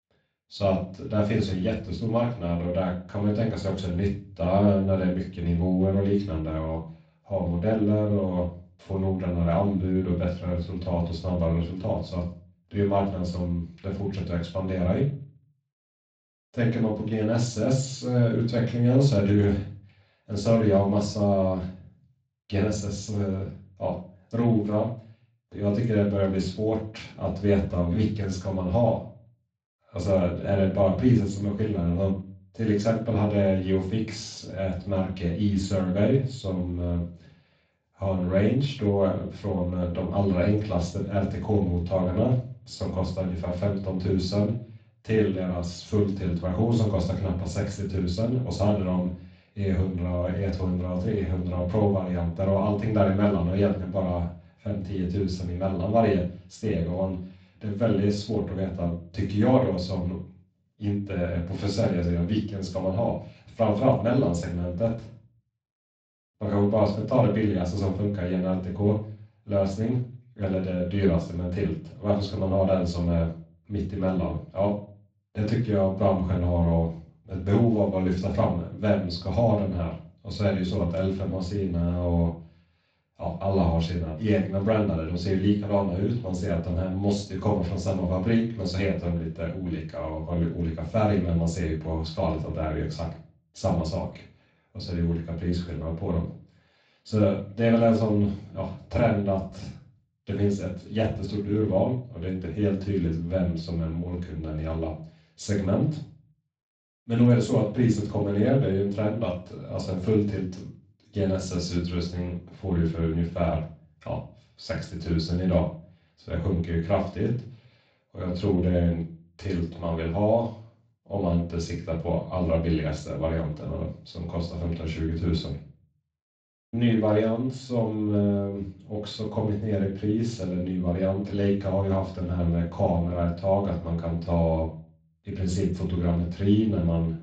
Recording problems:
off-mic speech; far
room echo; slight; dies away in 0.4 s
garbled, watery; slightly; nothing above 7.5 kHz

